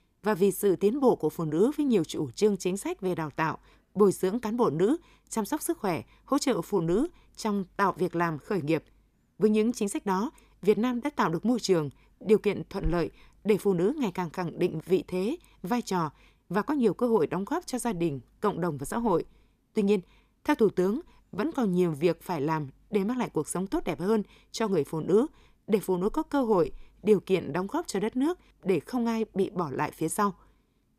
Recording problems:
none

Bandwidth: 14.5 kHz